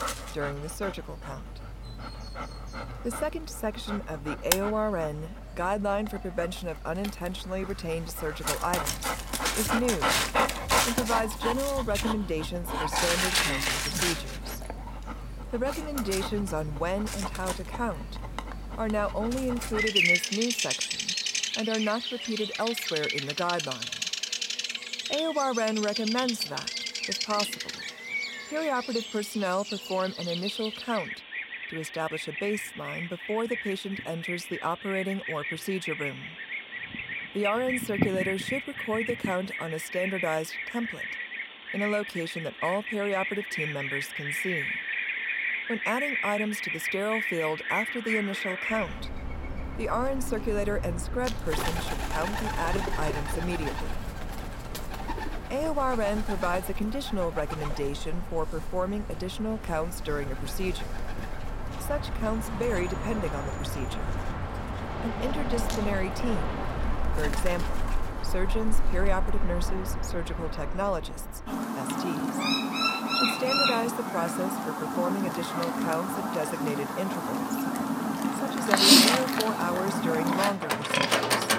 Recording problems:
animal sounds; very loud; throughout; 2 dB above the speech

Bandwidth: 16.5 kHz